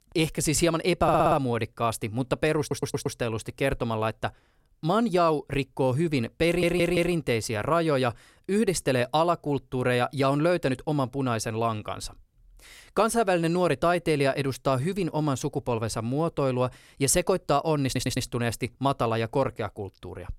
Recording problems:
audio stuttering; 4 times, first at 1 s

